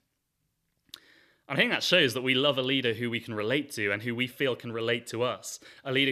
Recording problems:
abrupt cut into speech; at the end

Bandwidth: 14.5 kHz